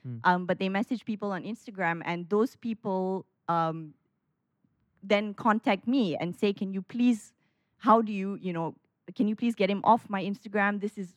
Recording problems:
muffled; slightly; fading above 3.5 kHz

